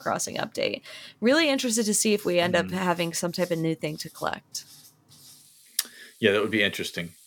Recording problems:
household noises; faint; throughout; 25 dB below the speech

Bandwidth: 18 kHz